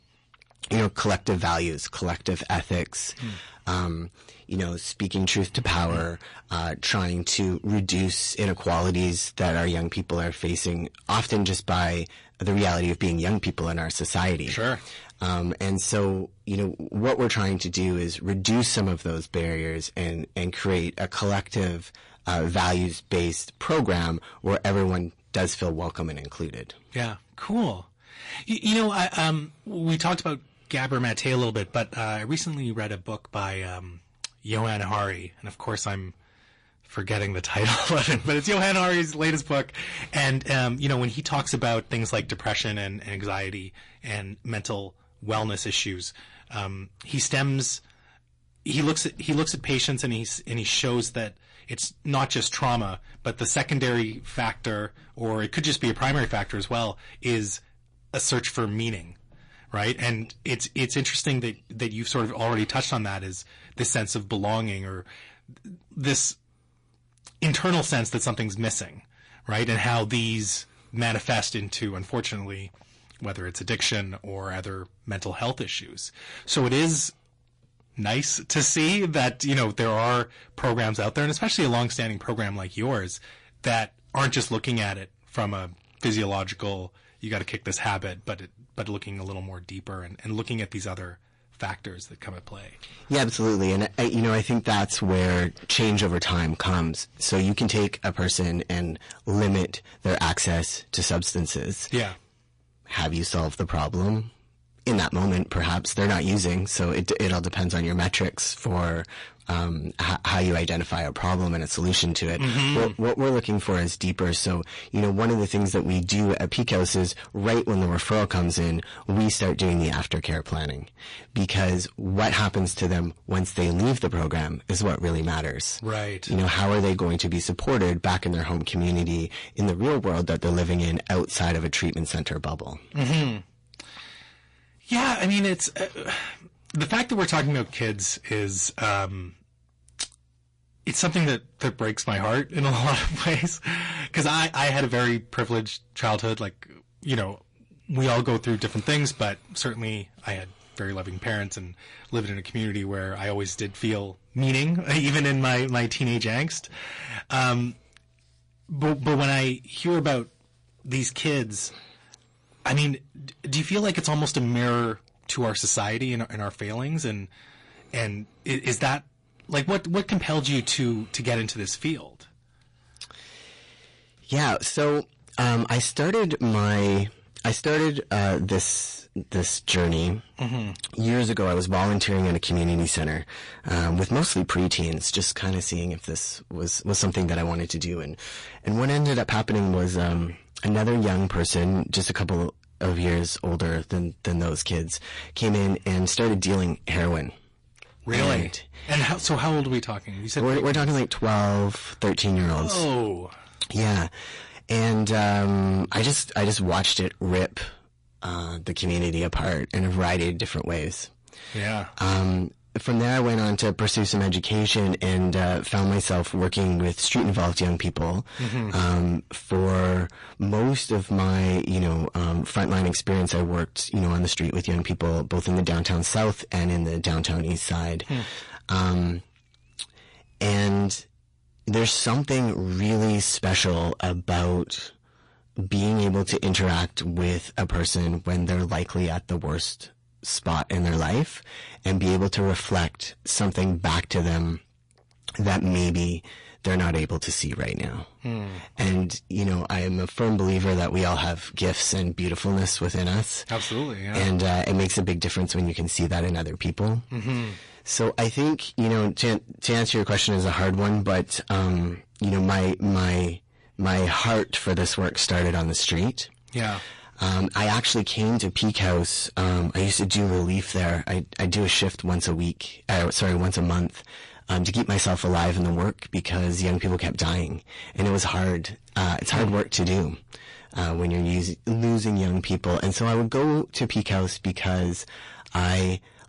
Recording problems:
distortion; heavy; 12% of the sound clipped
garbled, watery; slightly; nothing above 10.5 kHz

